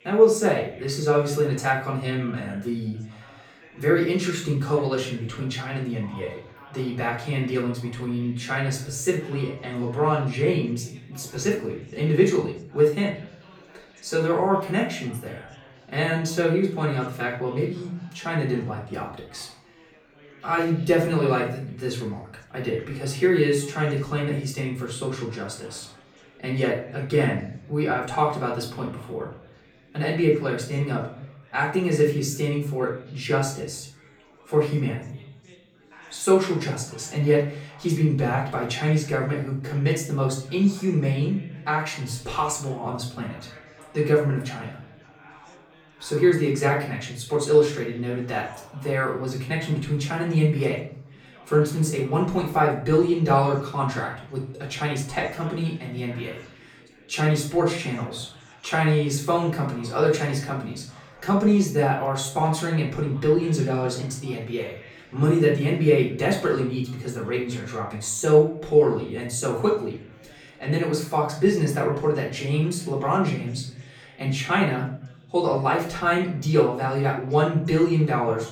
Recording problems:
off-mic speech; far
room echo; slight; dies away in 0.5 s
chatter from many people; faint; throughout; 25 dB below the speech

